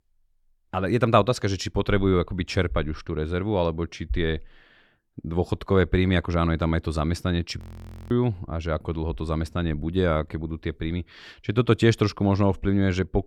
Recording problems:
audio freezing; at 7.5 s for 0.5 s

